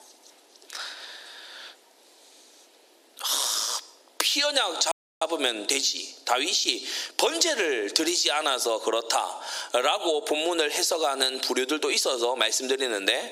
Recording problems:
squashed, flat; heavily
thin; very slightly; fading below 350 Hz
audio cutting out; at 5 s

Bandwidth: 15.5 kHz